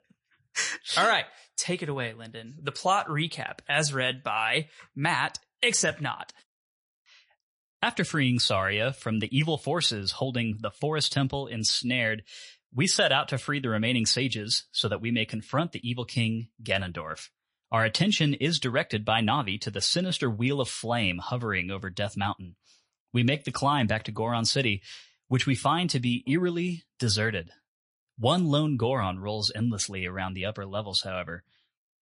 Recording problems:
garbled, watery; slightly; nothing above 10.5 kHz

